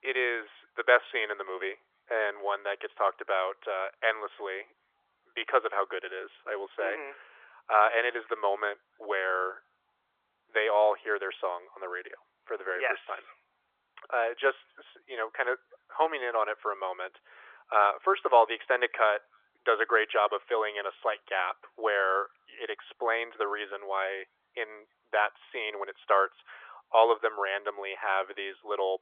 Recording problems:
thin; very; fading below 450 Hz
phone-call audio; nothing above 3.5 kHz
muffled; very slightly; fading above 2 kHz

